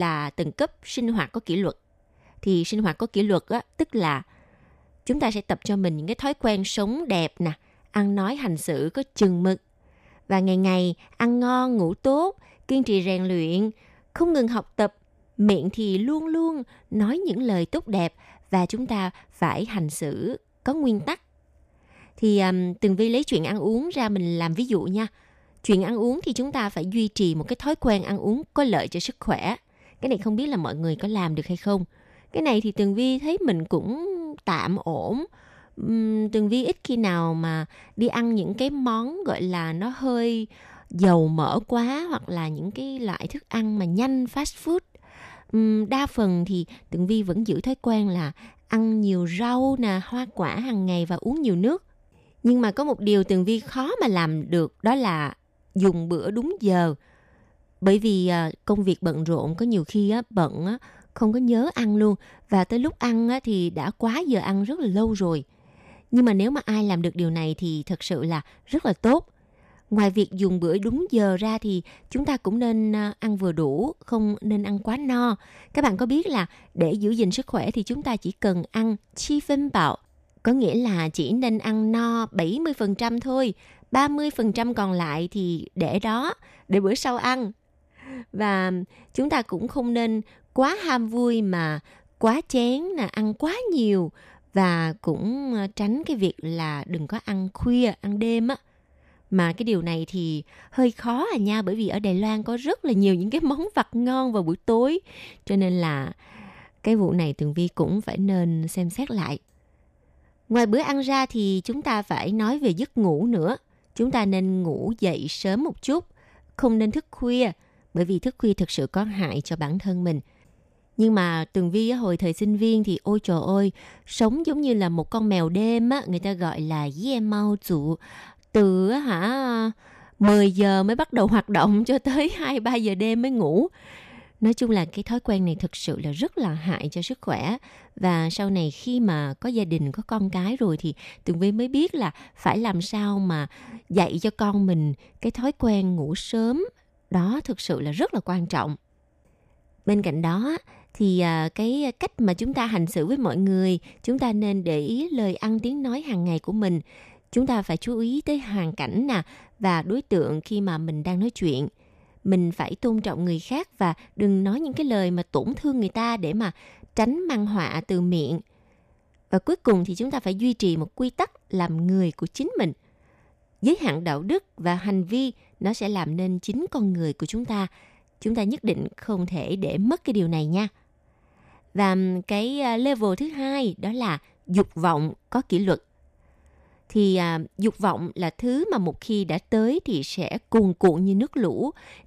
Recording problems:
abrupt cut into speech; at the start

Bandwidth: 14.5 kHz